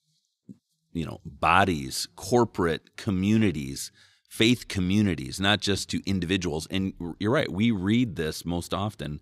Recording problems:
none

